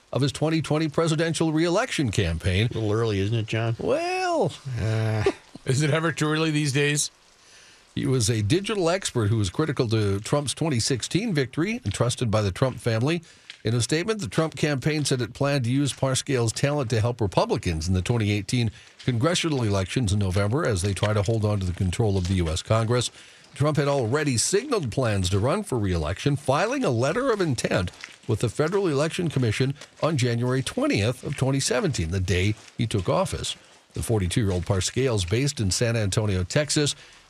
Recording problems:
rain or running water; faint; throughout; 25 dB below the speech

